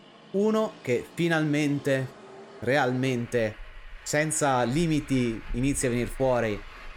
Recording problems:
traffic noise; noticeable; throughout; 20 dB below the speech

